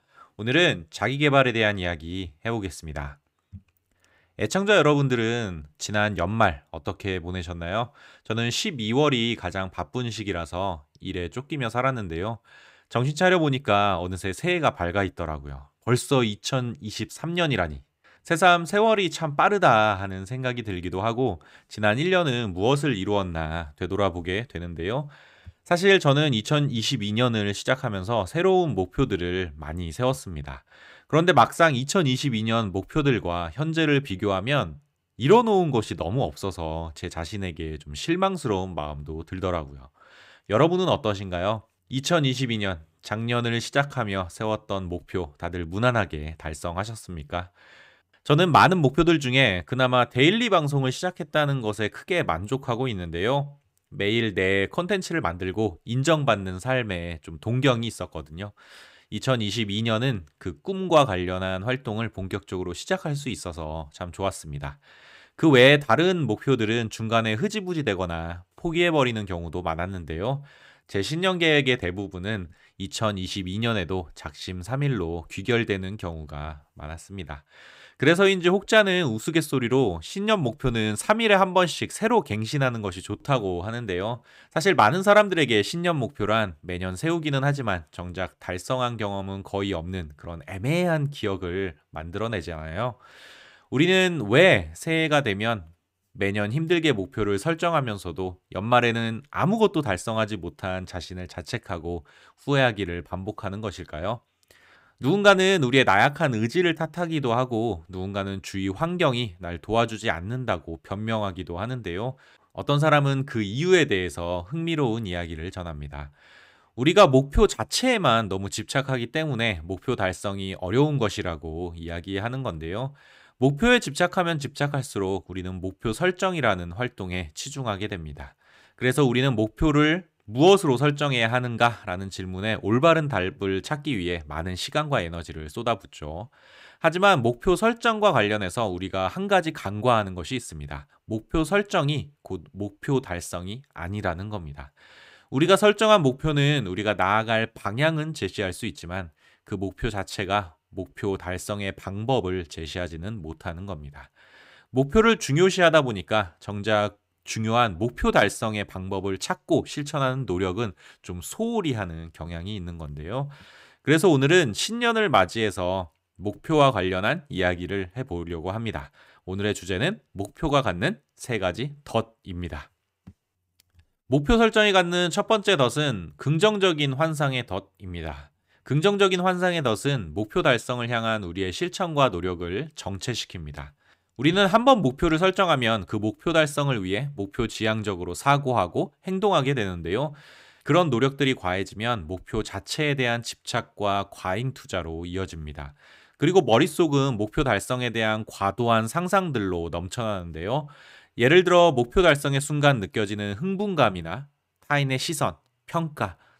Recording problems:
none

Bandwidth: 15.5 kHz